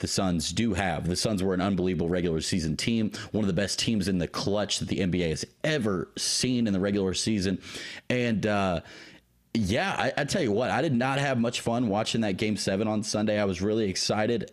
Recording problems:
squashed, flat; heavily

